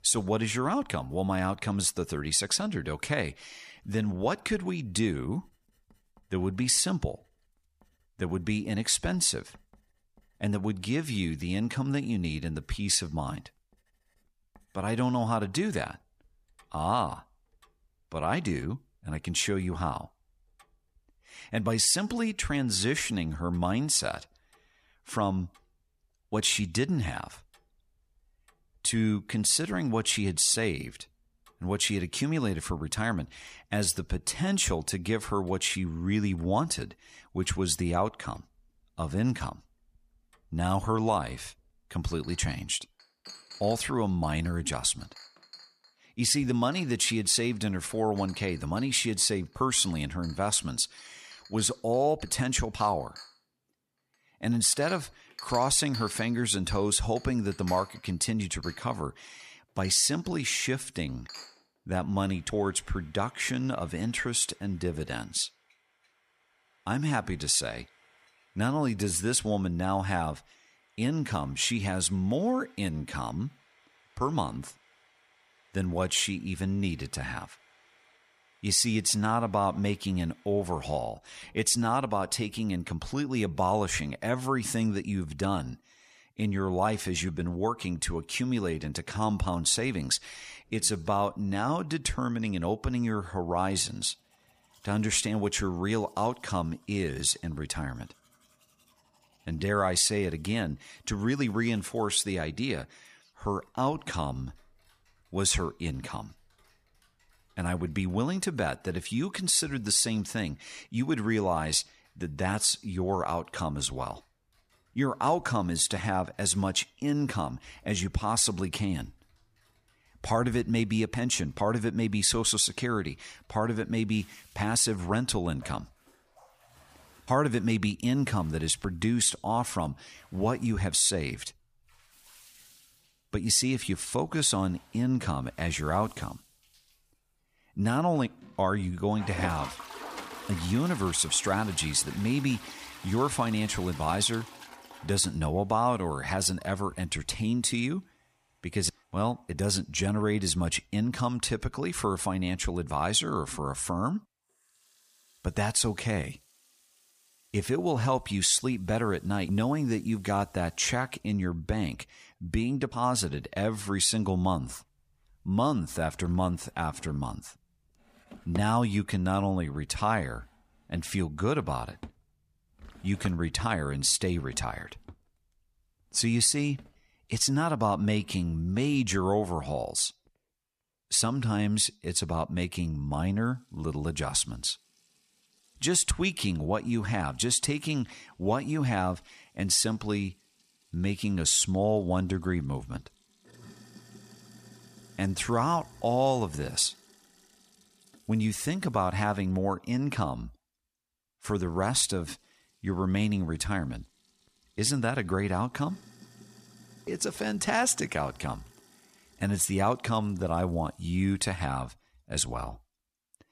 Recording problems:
household noises; faint; throughout; 20 dB below the speech

